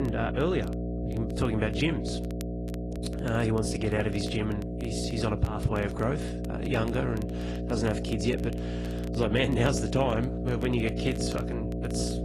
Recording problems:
garbled, watery; slightly
electrical hum; loud; throughout; 60 Hz, 7 dB below the speech
crackle, like an old record; faint; 25 dB below the speech
abrupt cut into speech; at the start

